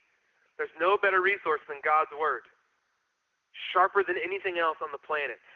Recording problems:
phone-call audio
garbled, watery; slightly

